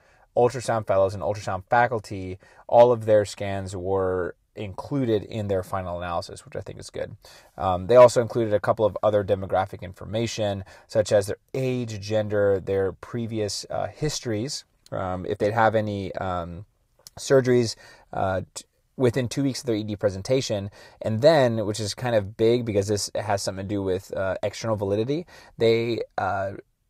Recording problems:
none

